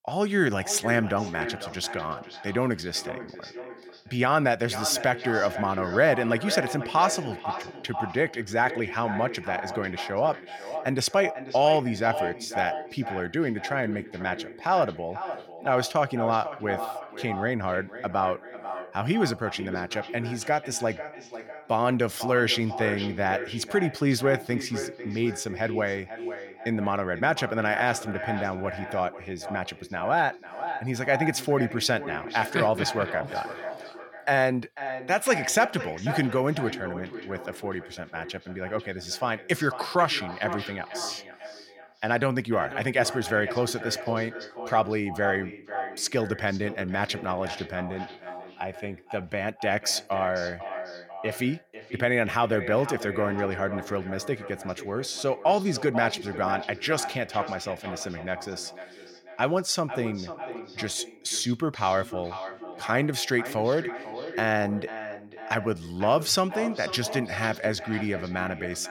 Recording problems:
echo of what is said; strong; throughout; 490 ms later, 10 dB below the speech

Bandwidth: 17 kHz